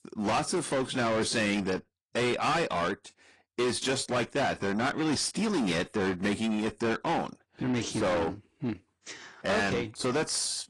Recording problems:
distortion; heavy; 6 dB below the speech
garbled, watery; slightly; nothing above 10 kHz

